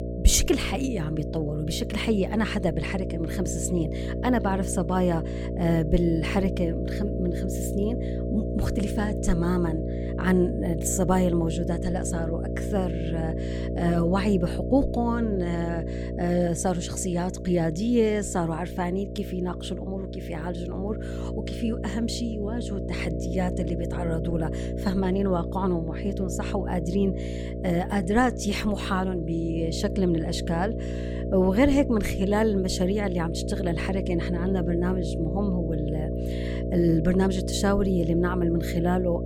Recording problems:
electrical hum; loud; throughout; 60 Hz, 7 dB below the speech

